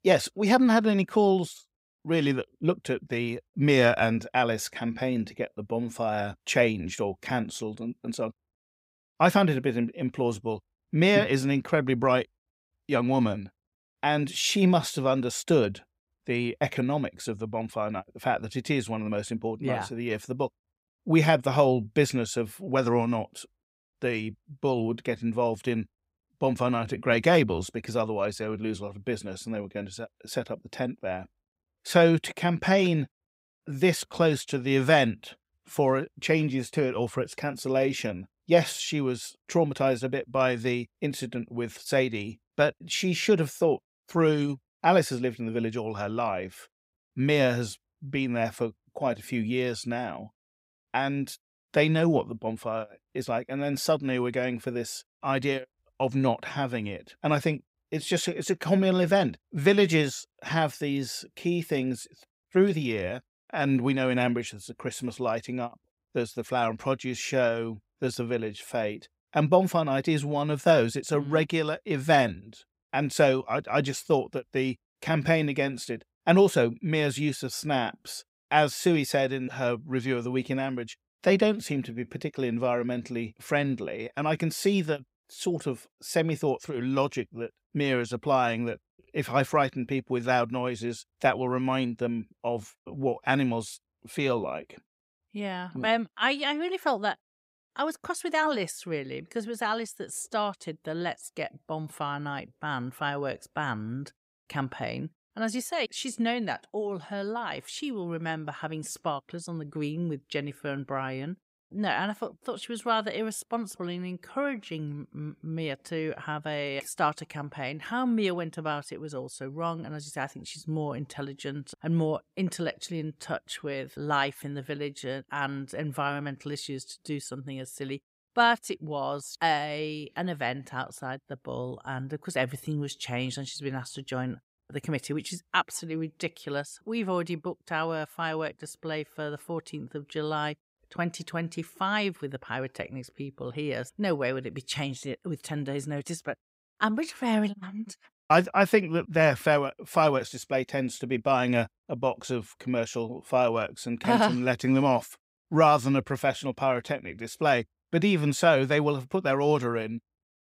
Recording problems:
none

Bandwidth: 15.5 kHz